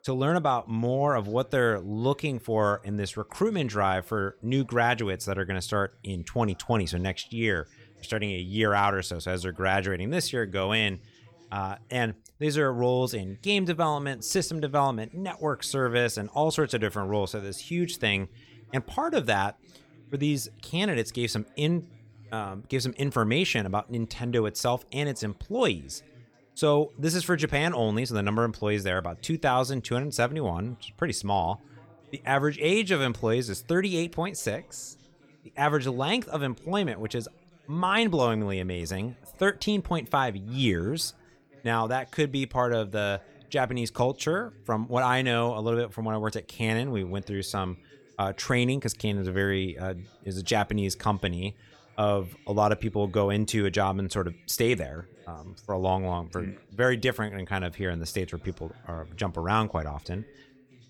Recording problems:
background chatter; faint; throughout; 2 voices, 30 dB below the speech

